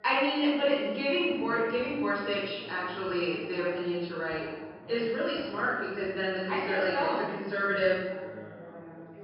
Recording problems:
room echo; strong; dies away in 1 s
off-mic speech; far
high frequencies cut off; noticeable; nothing above 5.5 kHz
background chatter; noticeable; throughout; 2 voices, 20 dB below the speech

